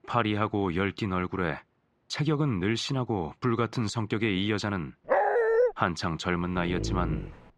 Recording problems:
muffled; slightly; fading above 3 kHz
dog barking; loud; at 5 s; peak 5 dB above the speech
dog barking; noticeable; at 6.5 s; peak 3 dB below the speech

